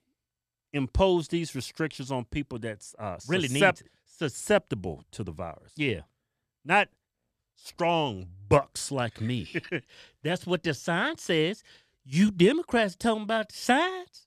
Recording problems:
none

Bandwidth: 14 kHz